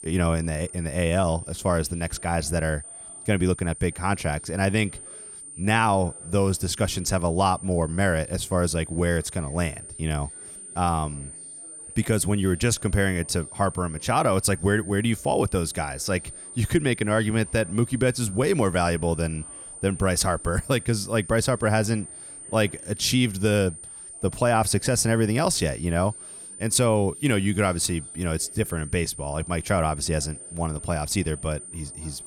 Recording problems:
high-pitched whine; noticeable; throughout; 9 kHz, 15 dB below the speech
background chatter; faint; throughout; 4 voices, 30 dB below the speech

